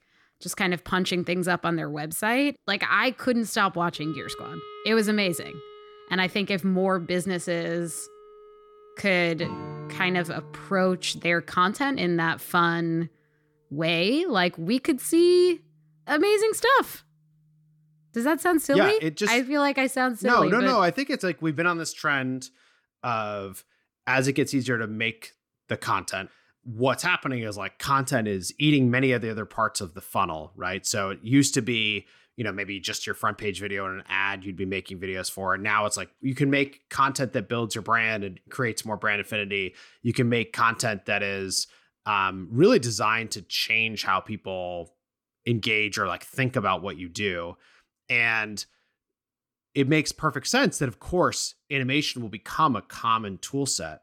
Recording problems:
background music; noticeable; until 19 s; 20 dB below the speech

